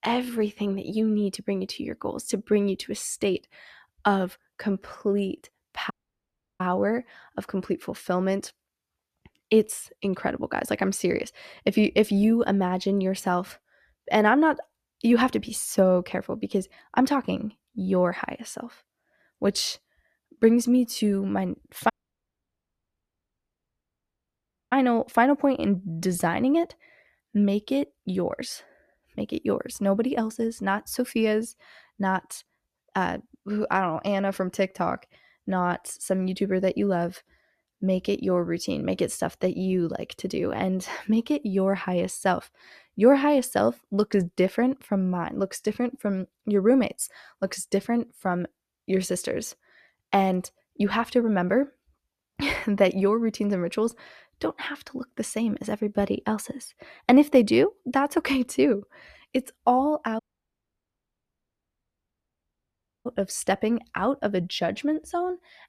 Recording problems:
audio cutting out; at 6 s for 0.5 s, at 22 s for 3 s and at 1:00 for 3 s

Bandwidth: 14.5 kHz